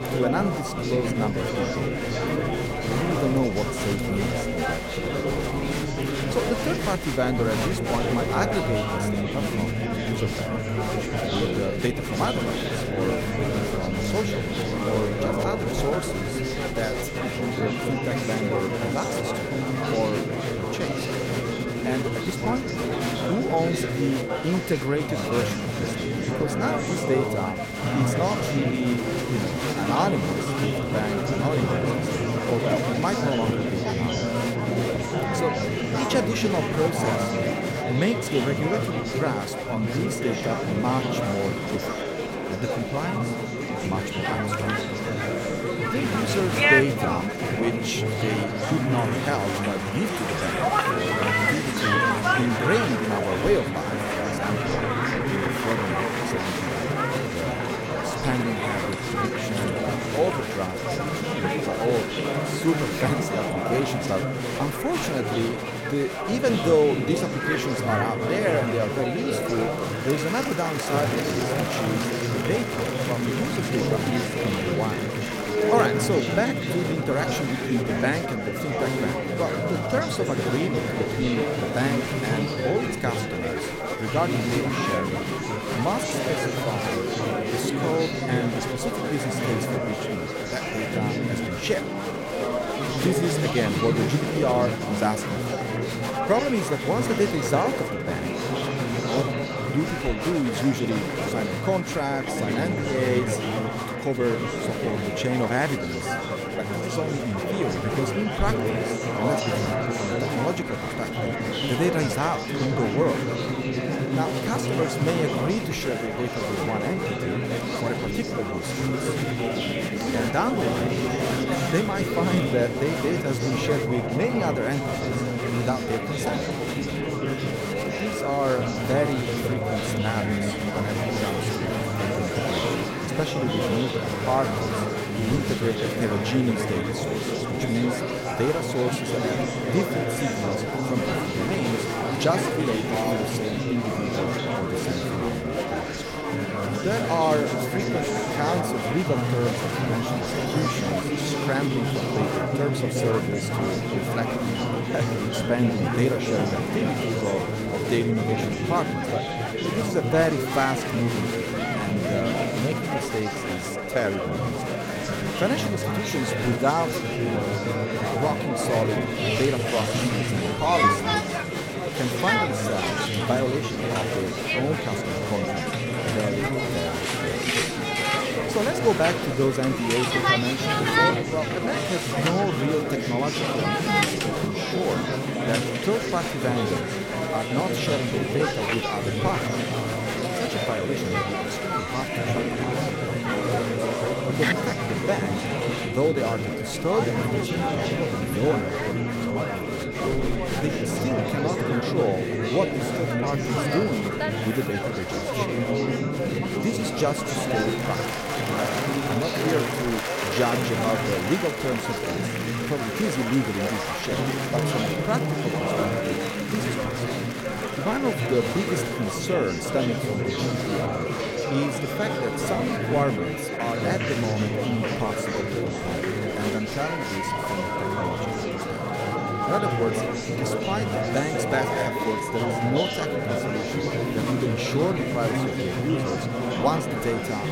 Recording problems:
murmuring crowd; very loud; throughout; 2 dB above the speech
high-pitched whine; noticeable; throughout; 2 kHz, 10 dB below the speech

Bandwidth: 16.5 kHz